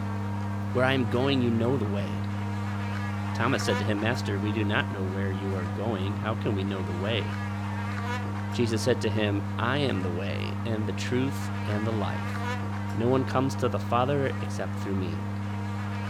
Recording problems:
electrical hum; loud; throughout; 50 Hz, 6 dB below the speech

